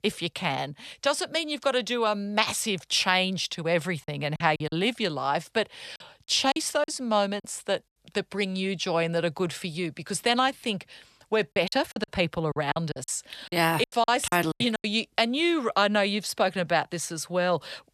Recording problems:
choppy; very; from 4 to 7.5 s and from 12 to 15 s; 14% of the speech affected

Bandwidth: 13.5 kHz